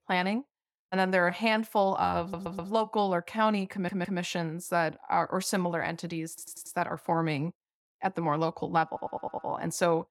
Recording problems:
audio stuttering; 4 times, first at 2 s

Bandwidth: 17.5 kHz